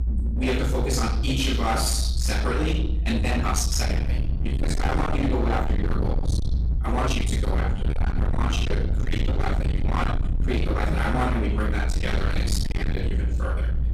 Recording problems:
distortion; heavy; 44% of the sound clipped
off-mic speech; far
room echo; noticeable; dies away in 0.7 s
low rumble; loud; throughout; 7 dB below the speech
uneven, jittery; strongly; from 3 to 13 s

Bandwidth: 14.5 kHz